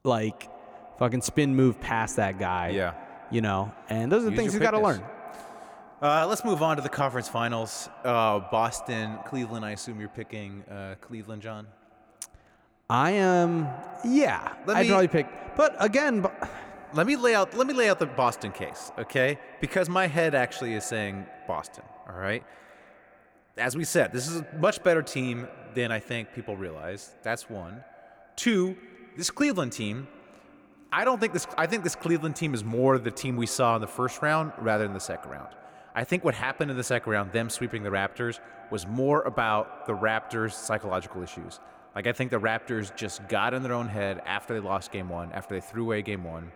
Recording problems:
echo of what is said; noticeable; throughout; 180 ms later, 20 dB below the speech

